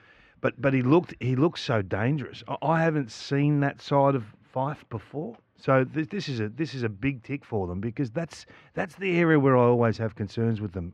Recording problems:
muffled; very; fading above 2 kHz

